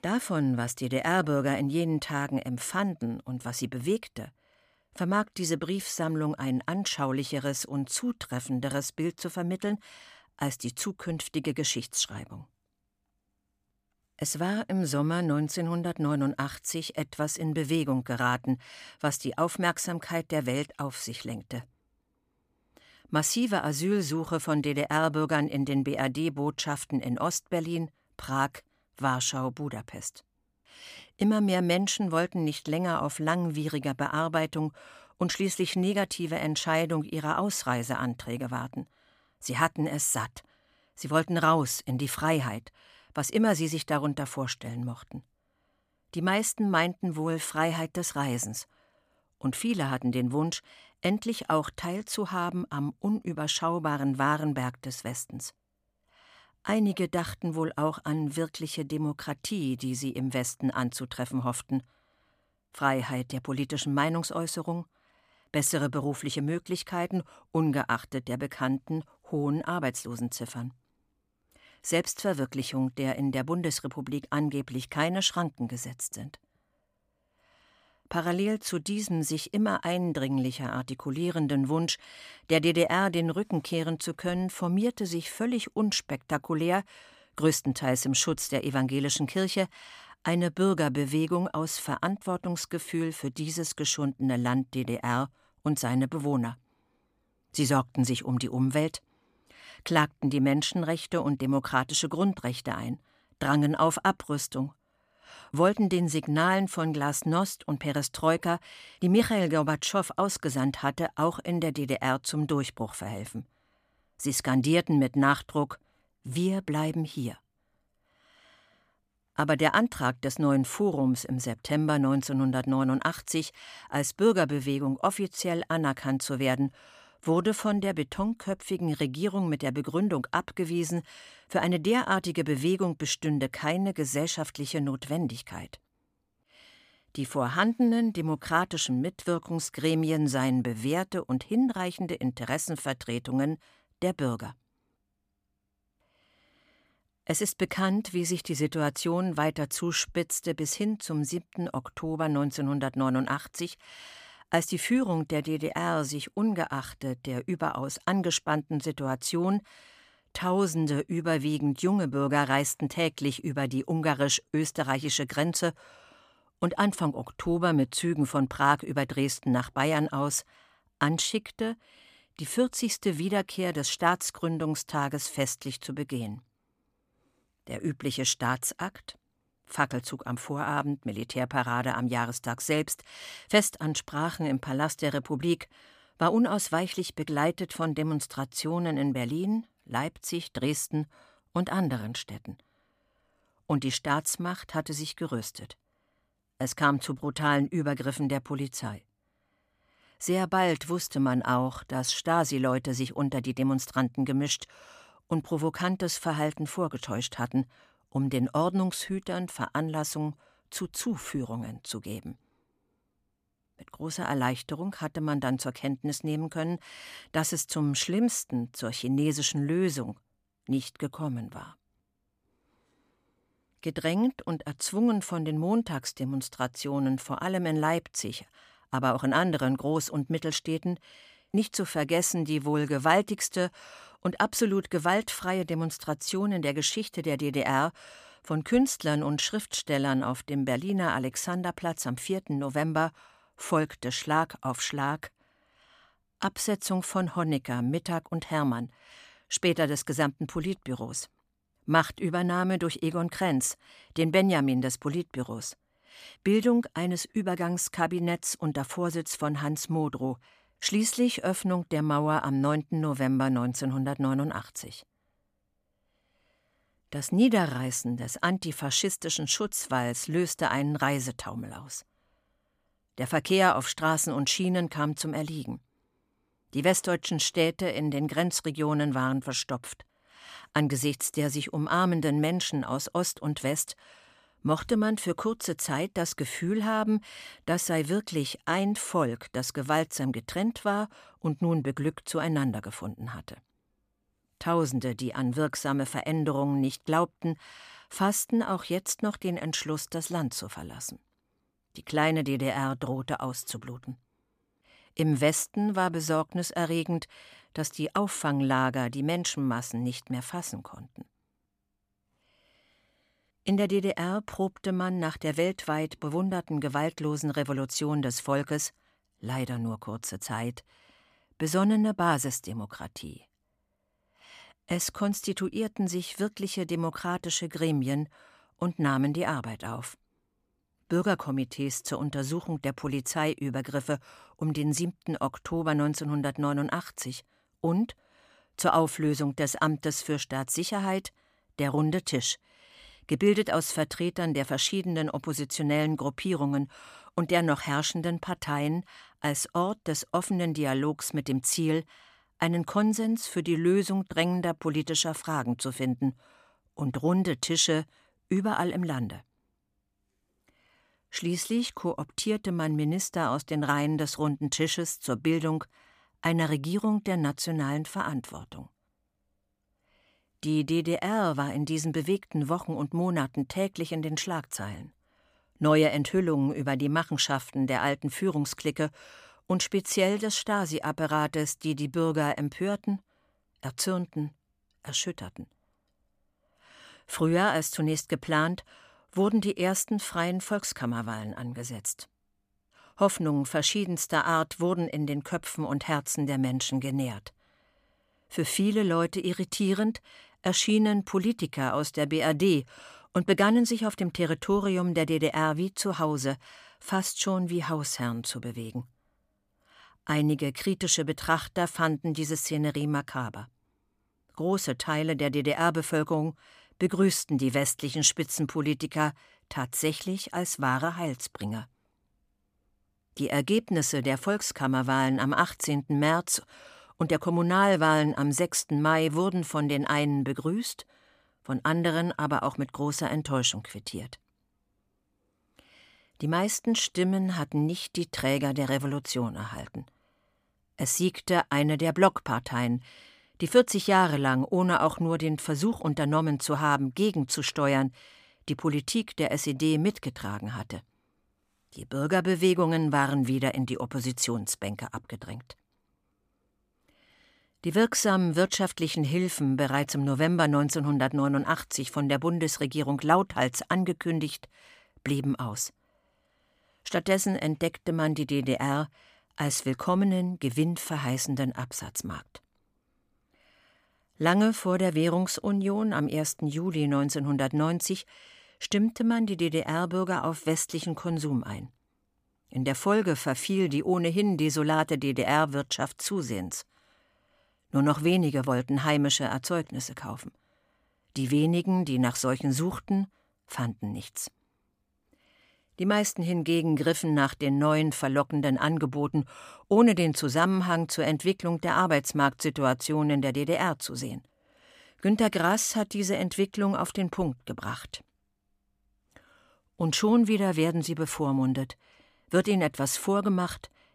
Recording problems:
none

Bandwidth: 15 kHz